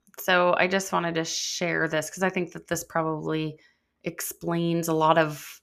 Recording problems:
none

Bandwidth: 14.5 kHz